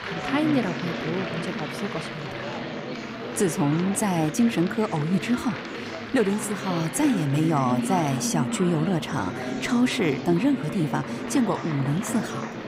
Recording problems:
chatter from many people; loud; throughout; 6 dB below the speech

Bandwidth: 15.5 kHz